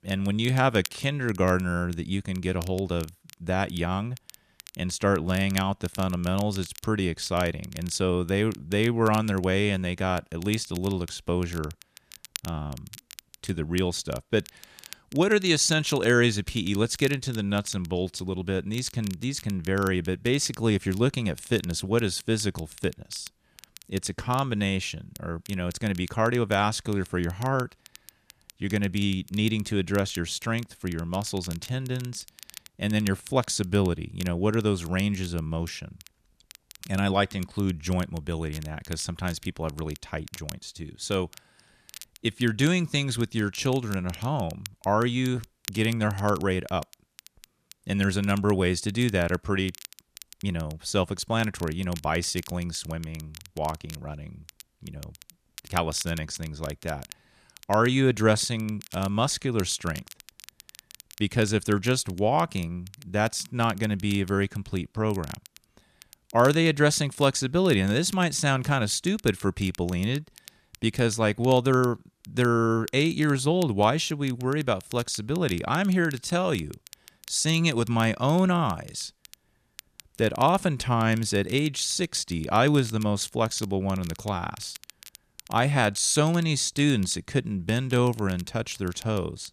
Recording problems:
crackle, like an old record; noticeable; 20 dB below the speech

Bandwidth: 14.5 kHz